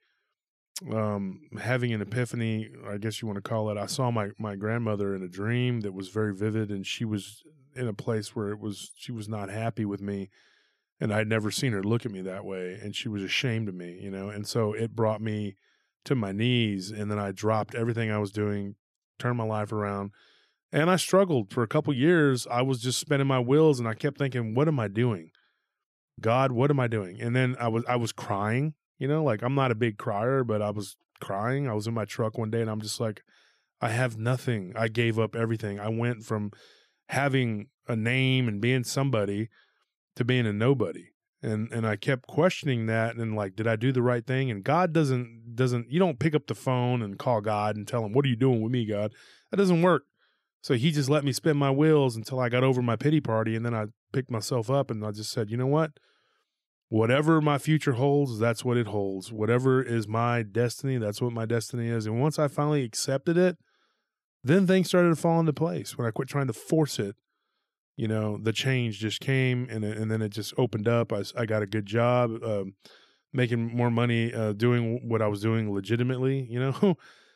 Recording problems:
none

